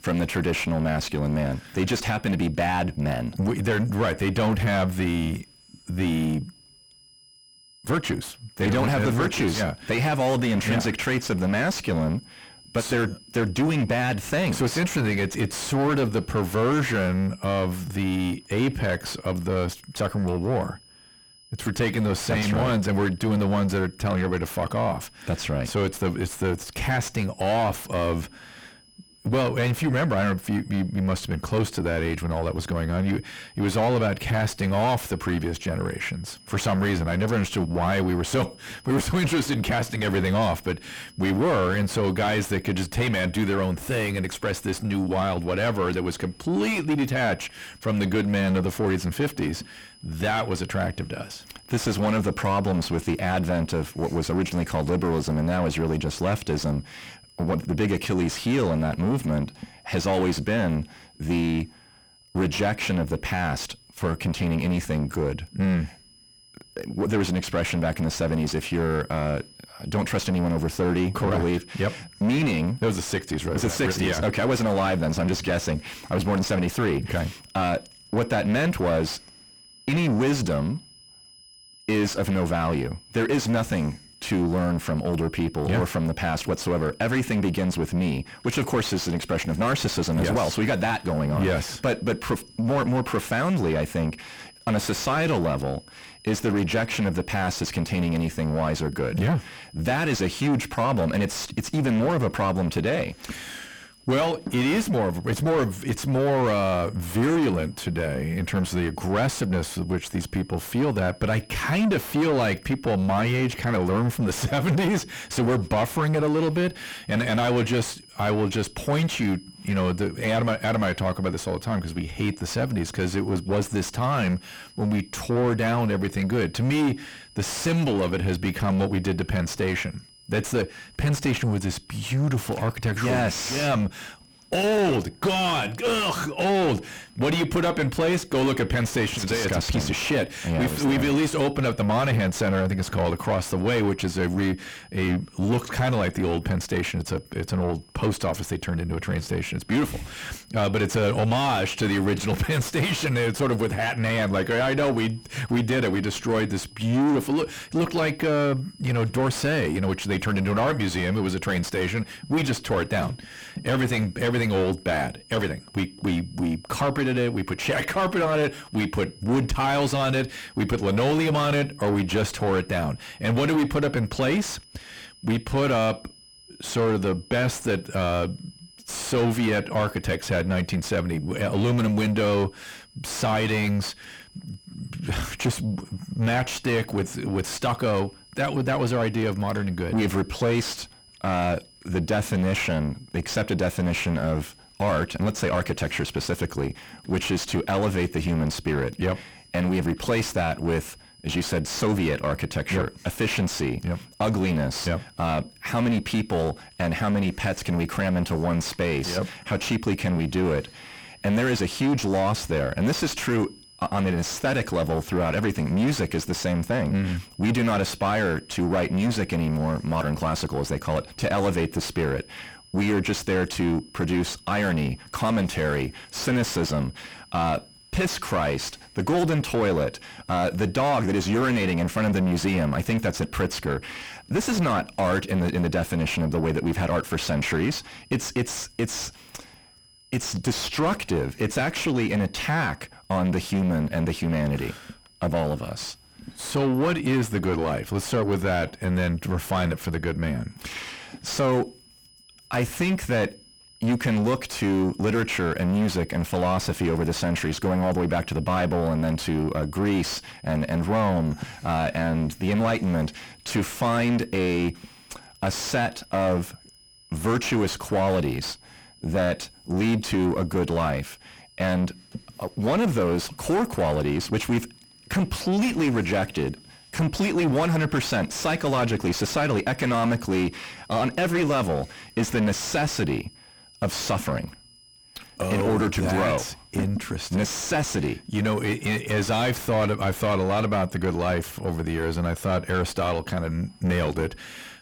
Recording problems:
distortion; heavy; 5 dB below the speech
high-pitched whine; faint; throughout; 5 kHz, 25 dB below the speech

